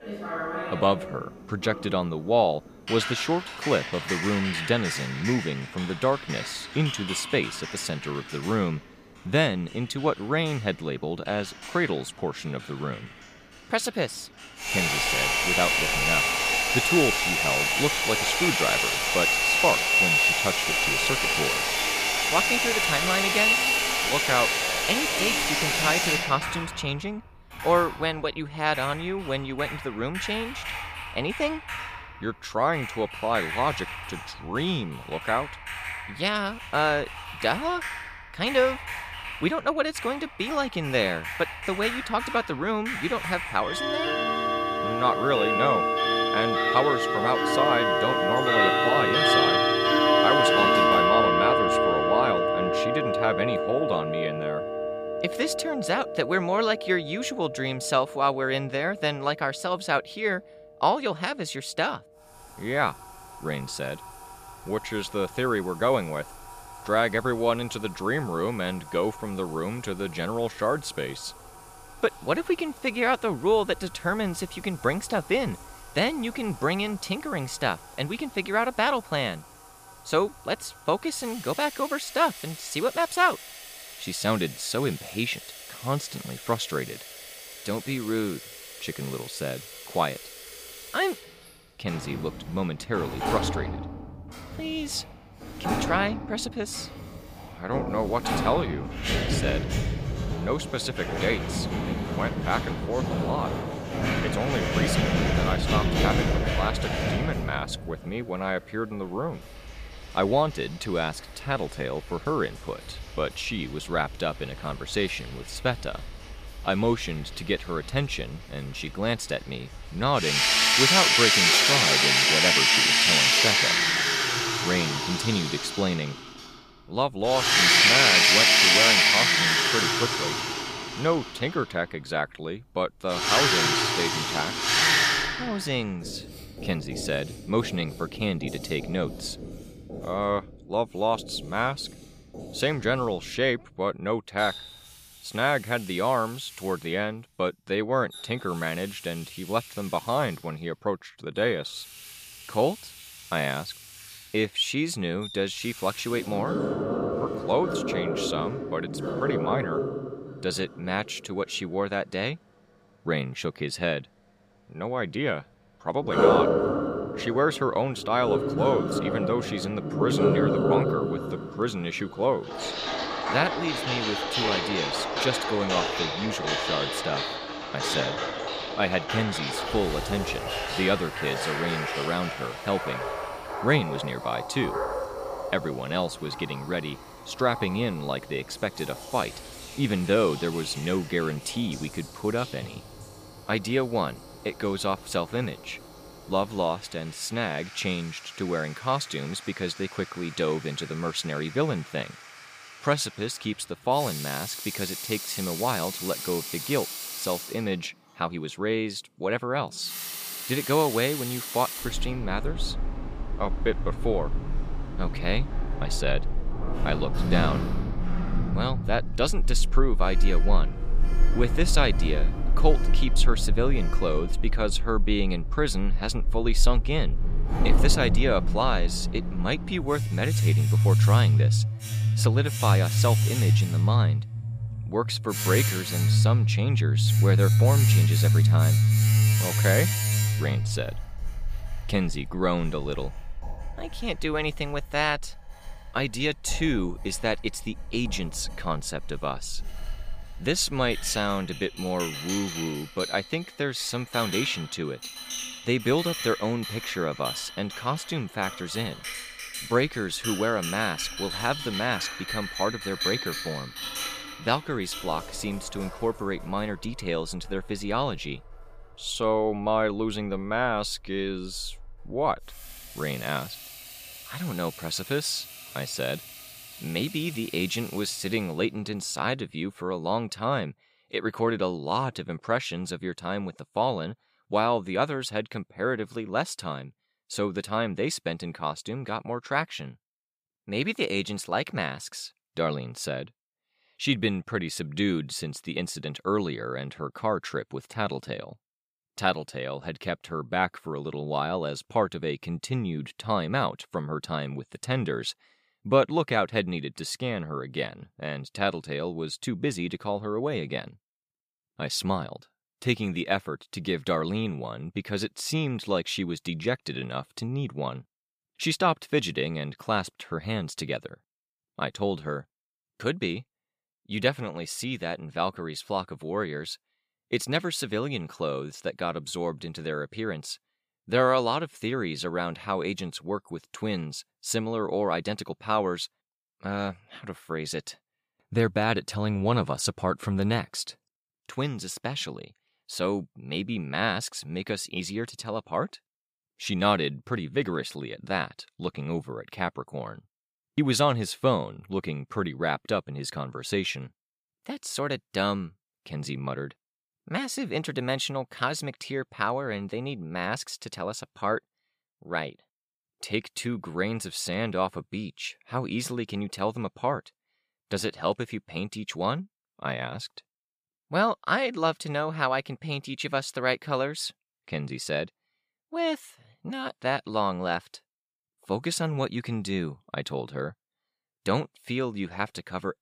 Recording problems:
household noises; very loud; until 4:39; 4 dB above the speech

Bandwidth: 15 kHz